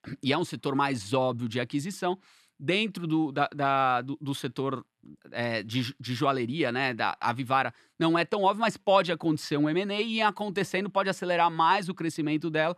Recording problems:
none

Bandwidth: 13.5 kHz